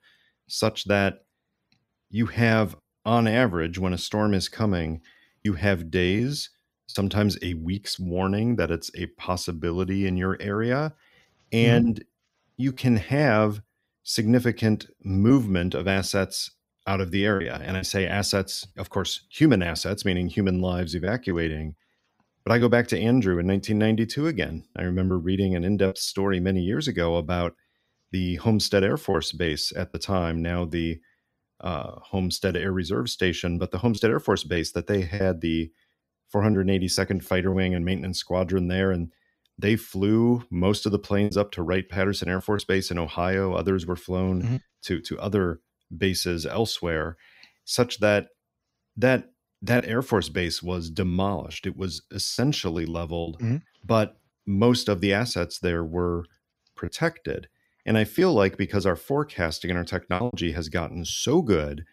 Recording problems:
choppy; occasionally; 3% of the speech affected

